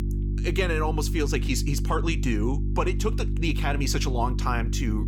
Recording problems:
electrical hum; noticeable; throughout; 50 Hz, 10 dB below the speech

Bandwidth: 17.5 kHz